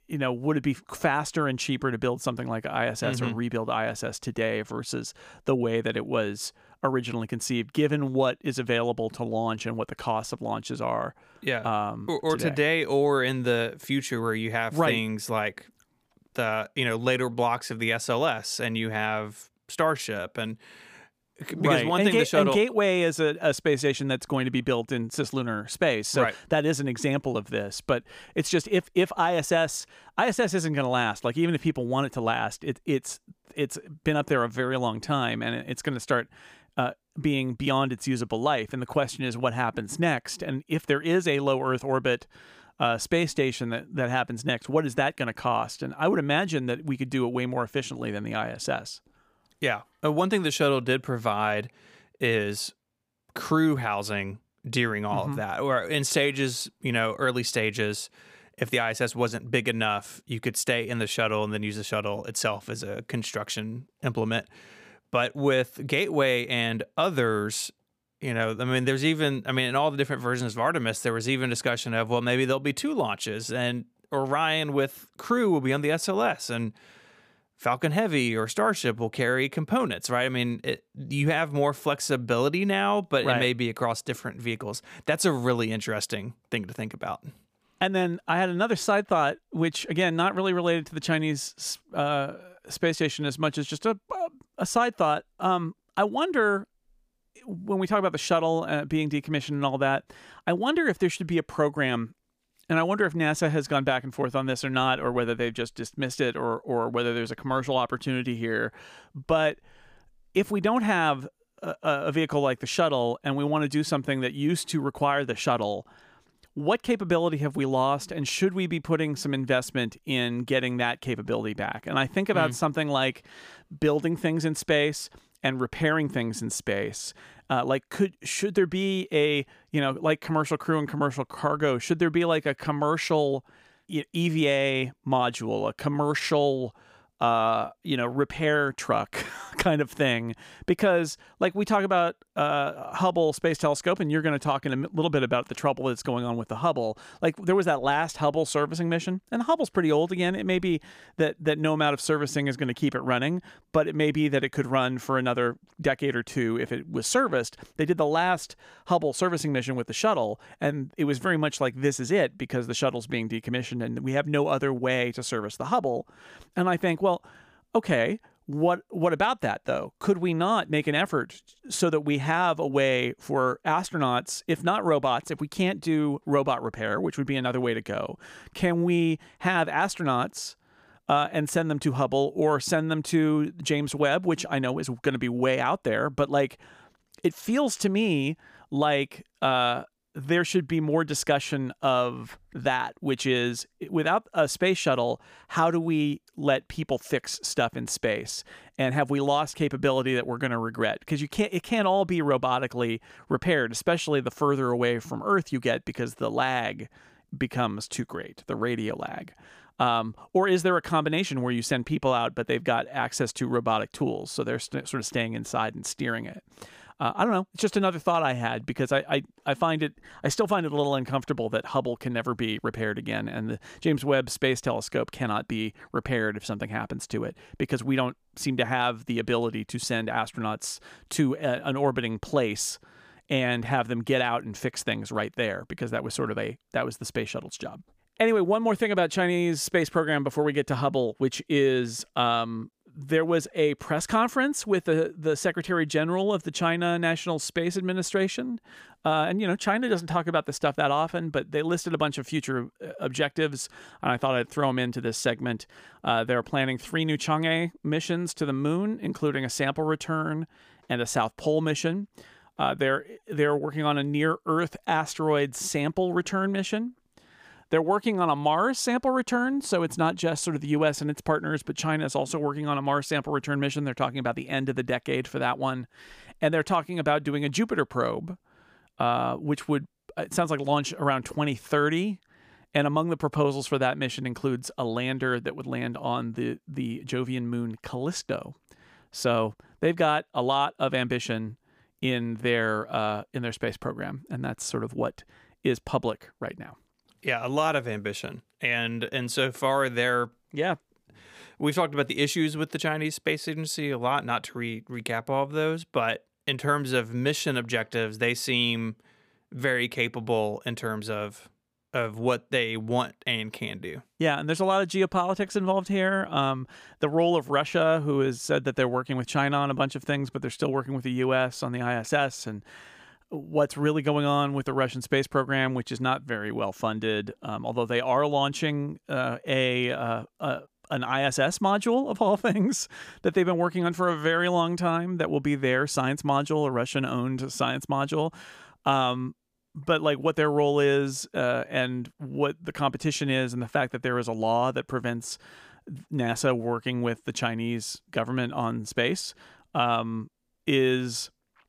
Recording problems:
none

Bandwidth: 15 kHz